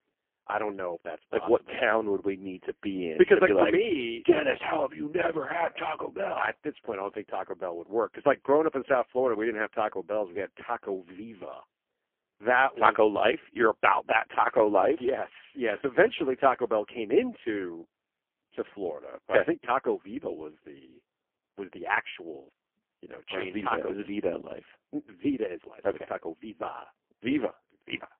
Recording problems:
phone-call audio; poor line; nothing above 3 kHz

